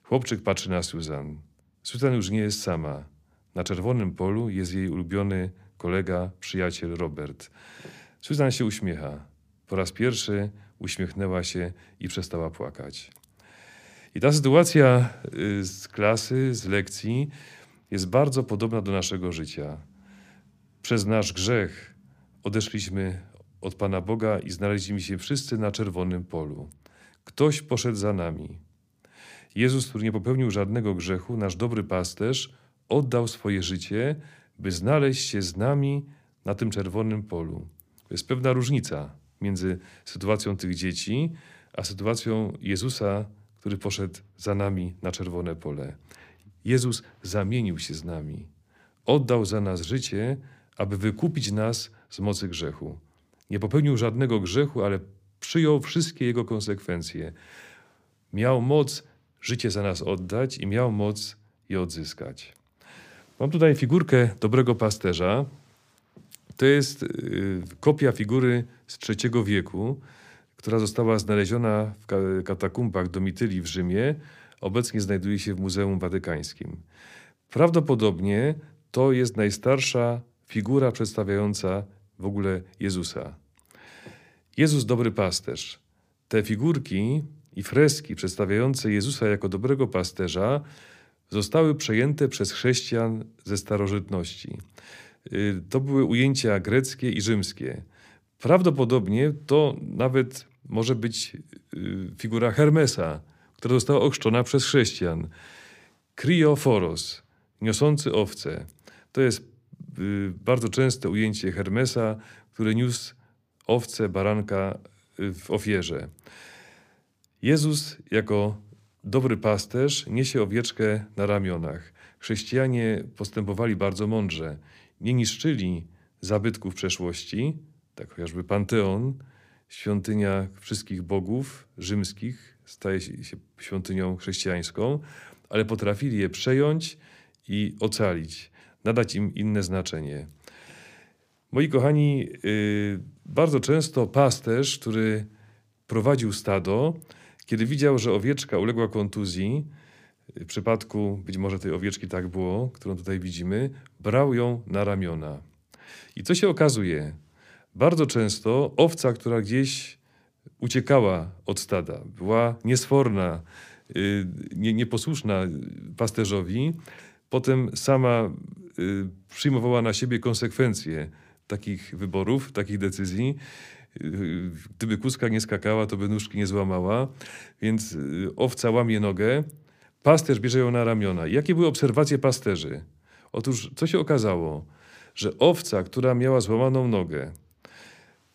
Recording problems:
none

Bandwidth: 15 kHz